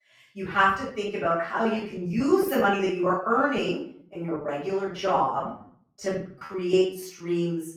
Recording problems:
off-mic speech; far
room echo; noticeable; dies away in 0.4 s
choppy; very; 17% of the speech affected

